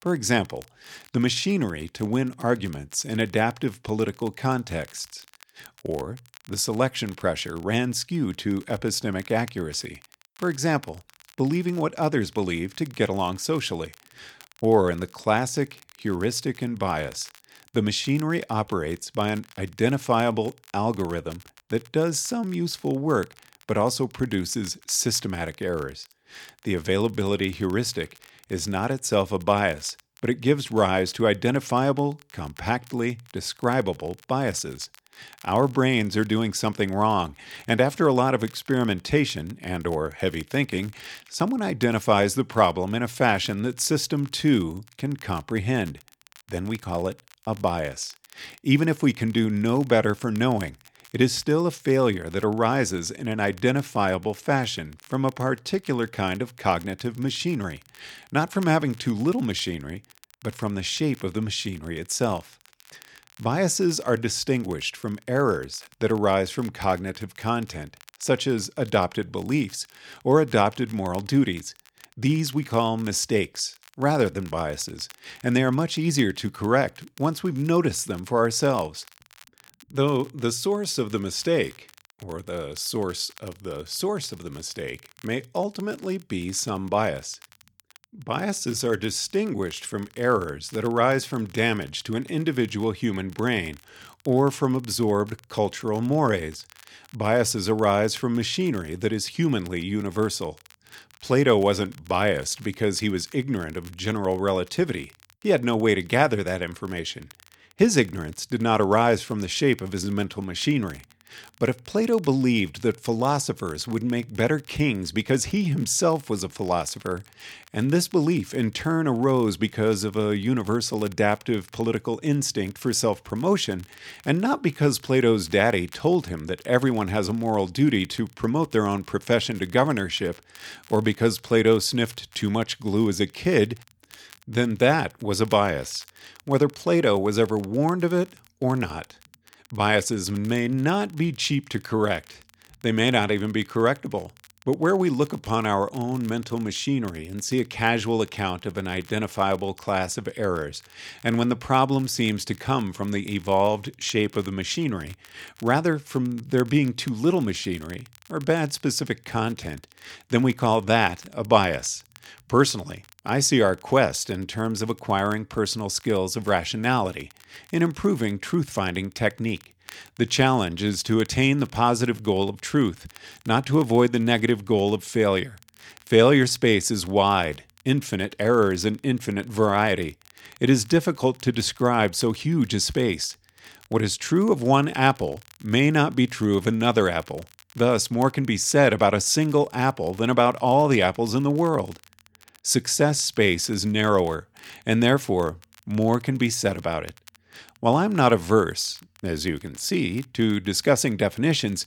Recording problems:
crackle, like an old record; faint; 25 dB below the speech

